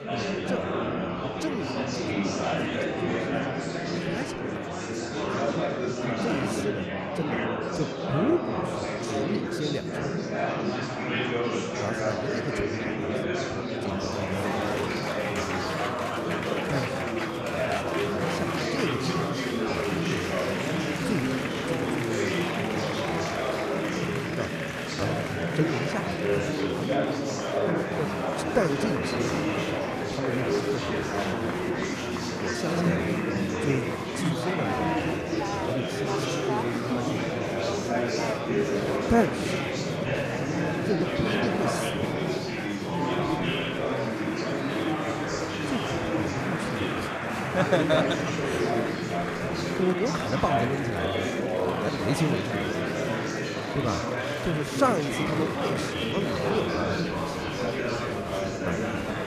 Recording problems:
murmuring crowd; very loud; throughout; 5 dB above the speech

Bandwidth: 14 kHz